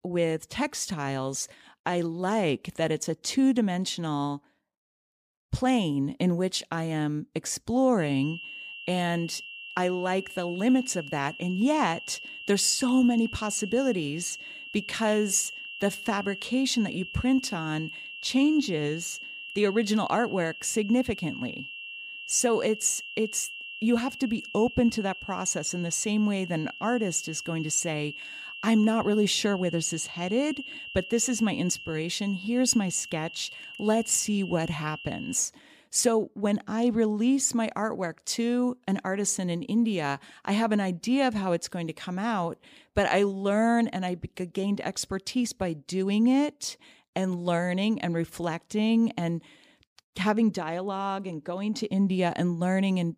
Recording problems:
high-pitched whine; noticeable; from 8 to 35 s; 2.5 kHz, 10 dB below the speech

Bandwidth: 15 kHz